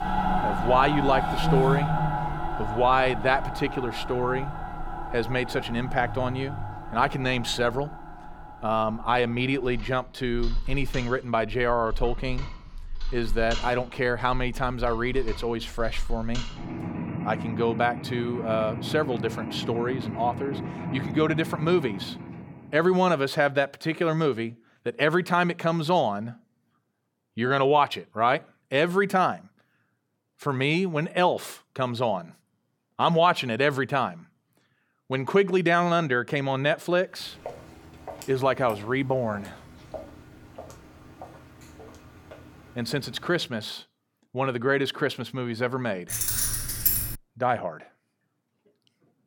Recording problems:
machinery noise; loud; until 22 s; 7 dB below the speech
footsteps; faint; from 37 to 43 s; peak 15 dB below the speech
jangling keys; loud; from 46 to 47 s; peak 3 dB above the speech

